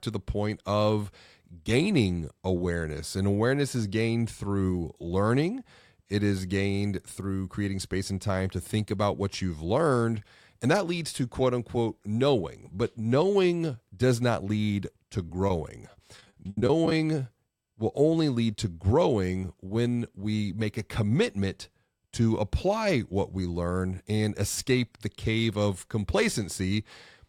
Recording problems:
choppy; very; from 15 to 17 s; 11% of the speech affected

